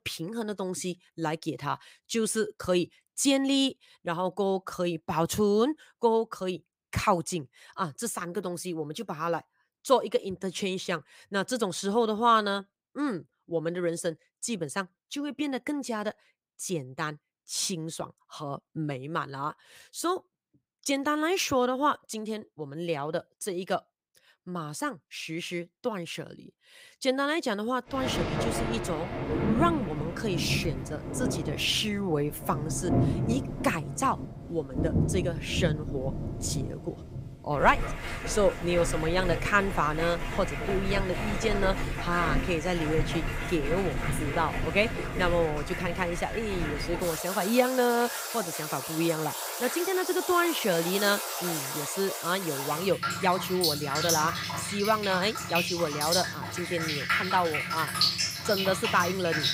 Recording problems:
rain or running water; loud; from 28 s on; 2 dB below the speech

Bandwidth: 15.5 kHz